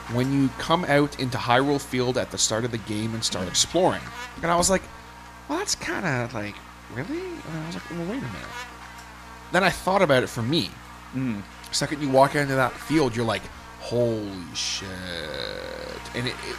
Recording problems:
electrical hum; noticeable; throughout; 60 Hz, 15 dB below the speech

